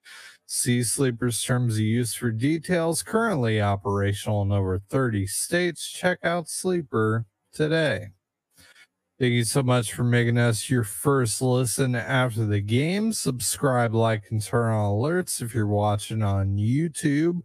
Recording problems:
wrong speed, natural pitch; too slow; 0.6 times normal speed

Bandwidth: 15 kHz